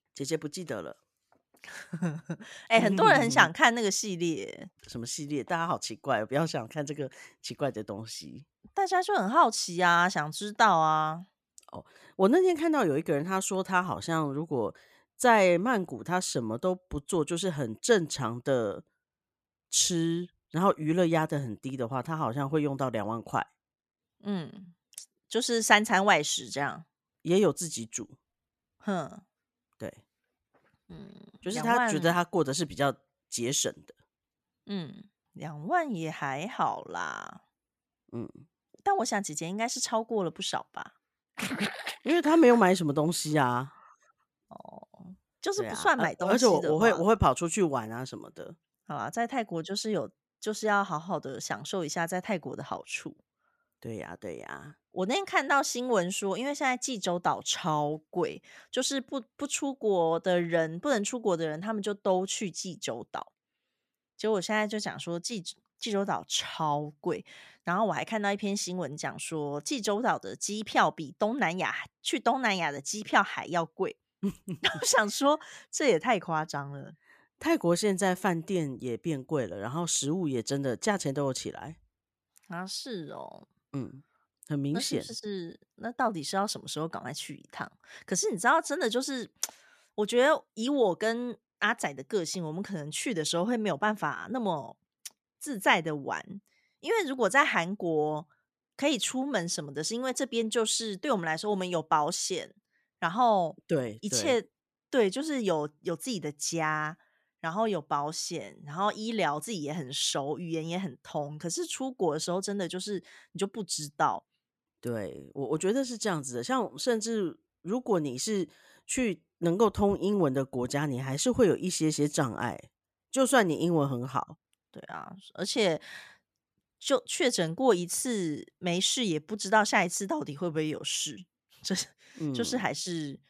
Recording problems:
none

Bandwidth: 14.5 kHz